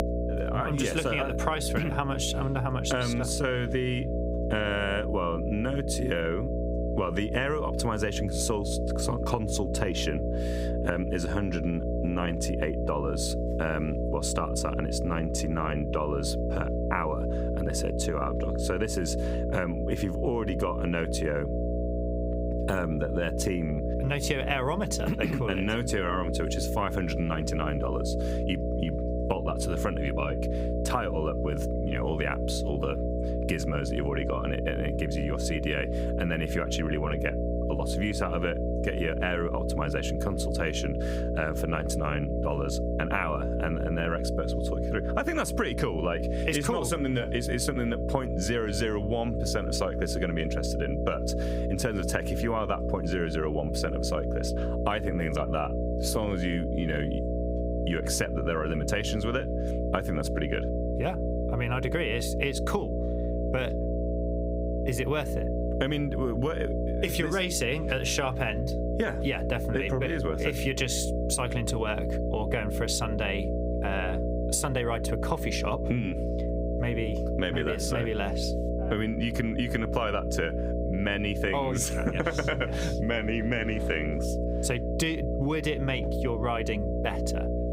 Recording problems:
squashed, flat; somewhat
electrical hum; loud; throughout; 60 Hz, 4 dB below the speech

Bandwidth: 15.5 kHz